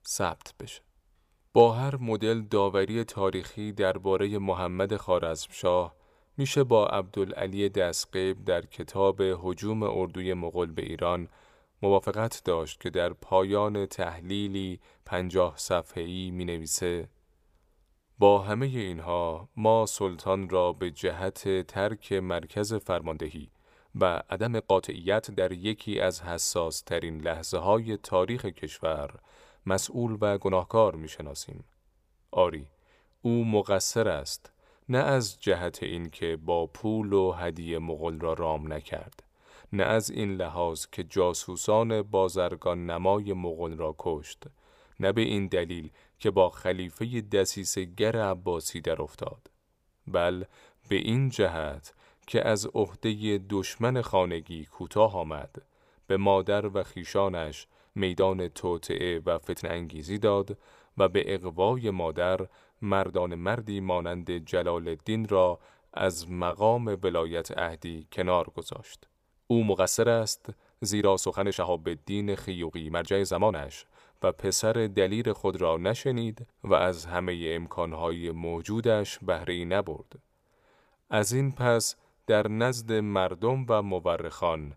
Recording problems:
uneven, jittery; strongly; from 12 s to 1:23

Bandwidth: 15 kHz